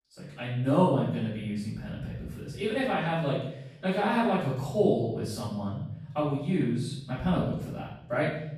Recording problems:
off-mic speech; far
room echo; noticeable; dies away in 0.9 s

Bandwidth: 15 kHz